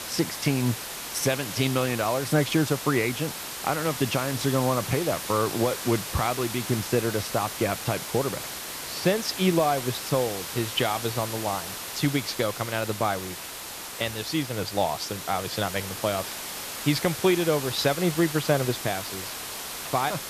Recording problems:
hiss; loud; throughout; 6 dB below the speech

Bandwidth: 14.5 kHz